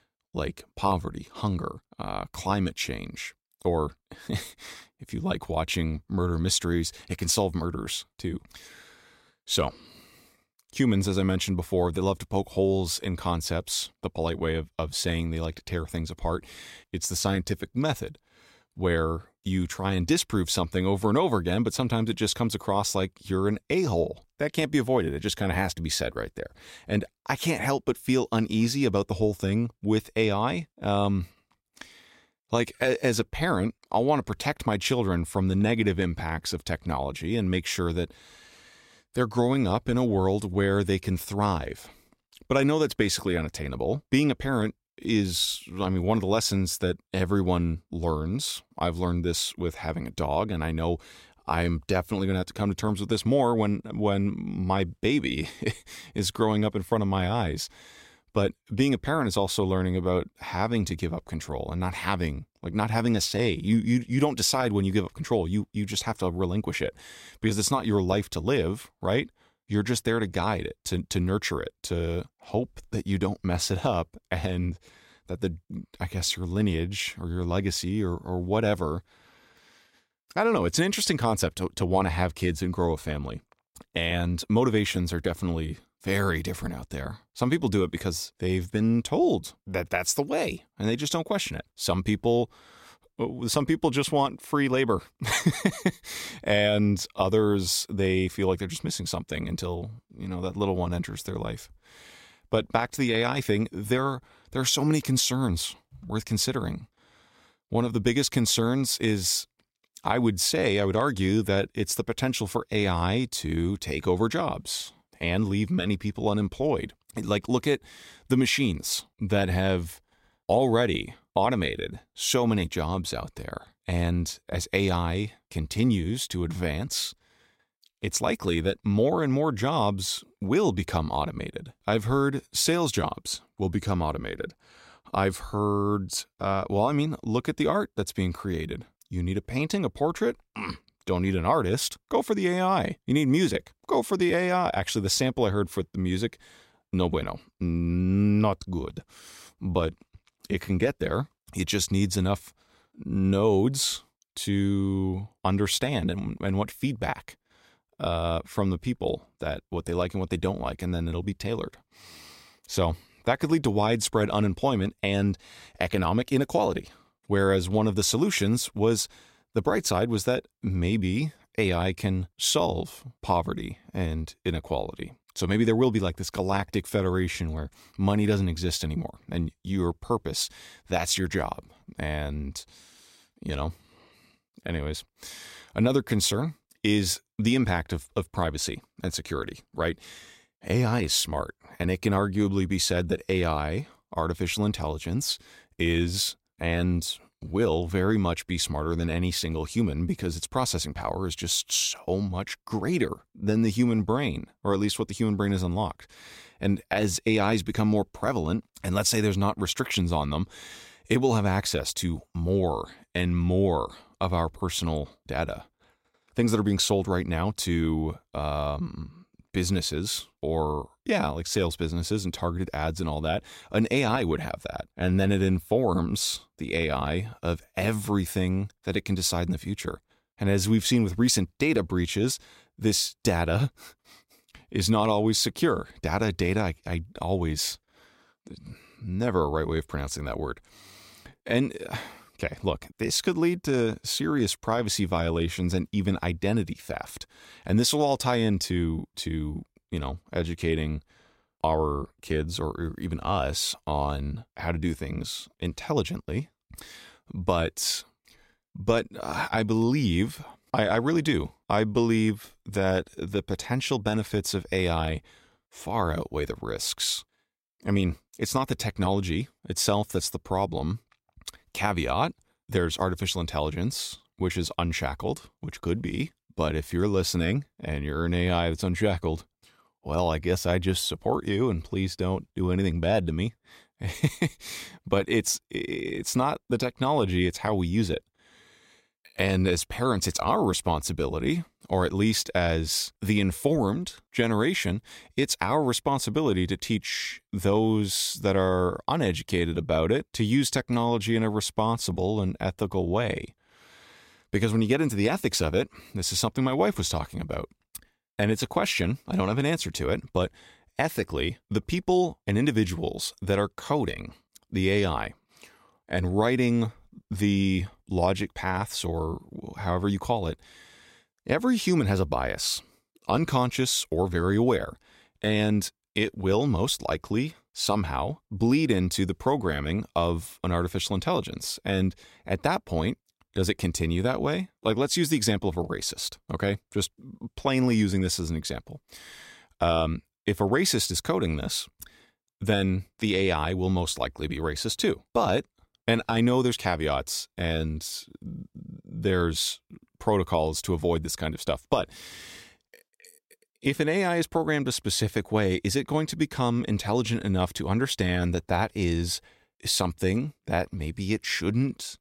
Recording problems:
none

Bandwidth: 16 kHz